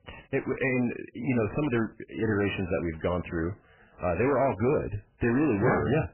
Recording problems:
garbled, watery; badly; nothing above 2.5 kHz
distortion; slight; 9 dB below the speech

